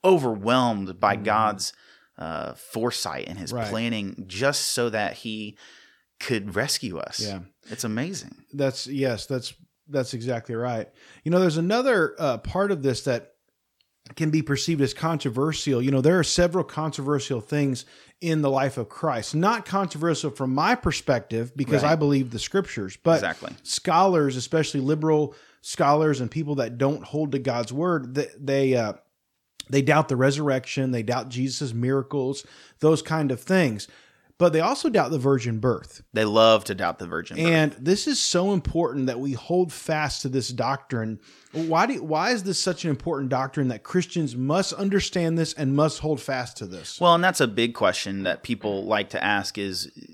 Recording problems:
none

